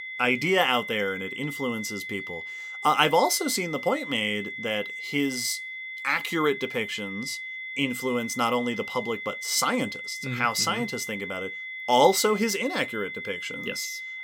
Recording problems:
high-pitched whine; loud; throughout; 2 kHz, 8 dB below the speech

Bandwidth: 16.5 kHz